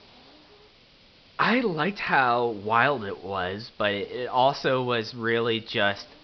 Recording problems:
high frequencies cut off; noticeable; nothing above 5.5 kHz
hiss; faint; throughout; 25 dB below the speech

